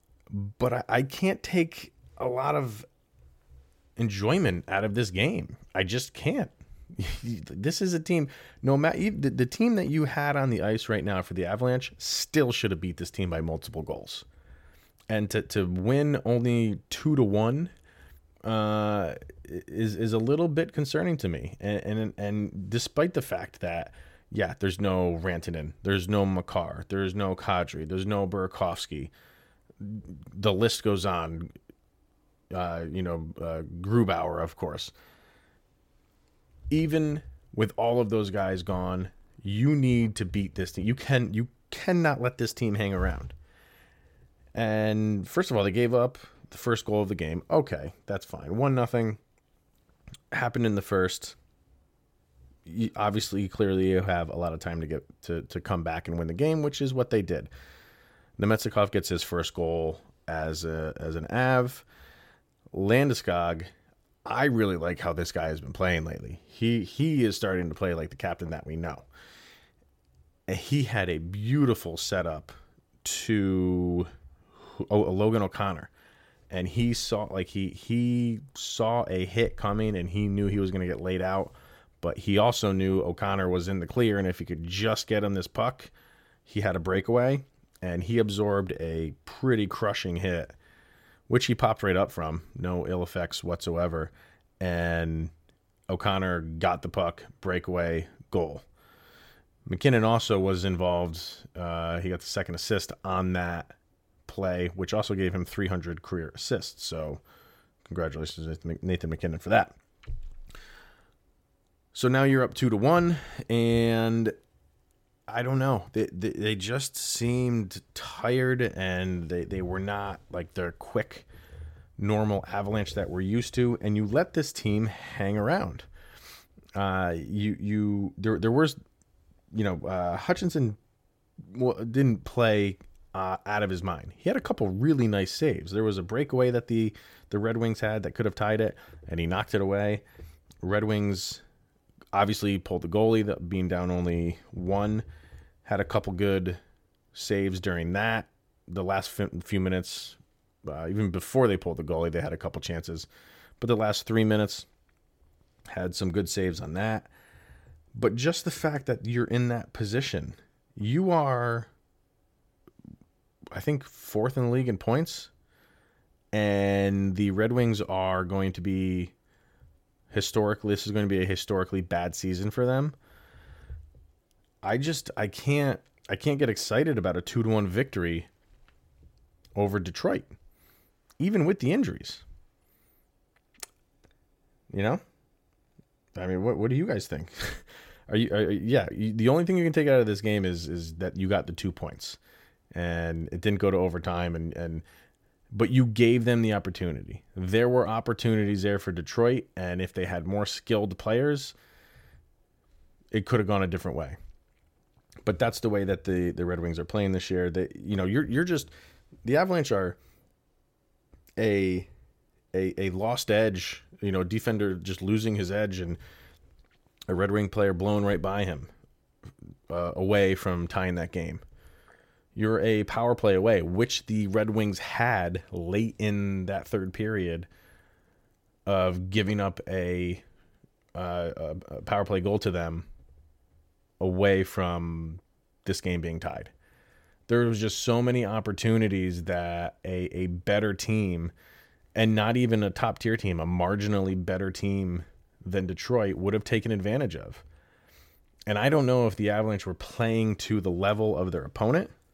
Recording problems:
none

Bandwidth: 16.5 kHz